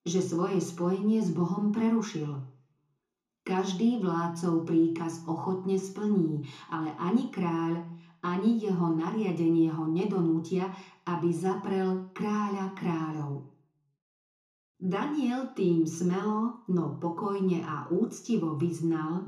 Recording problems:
off-mic speech; far
room echo; slight; dies away in 0.6 s

